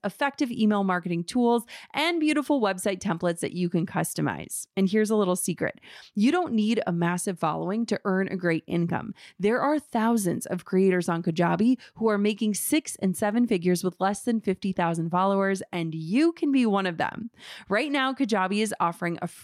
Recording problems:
none

